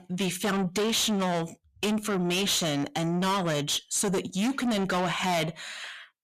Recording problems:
distortion; heavy; 6 dB below the speech

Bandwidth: 14.5 kHz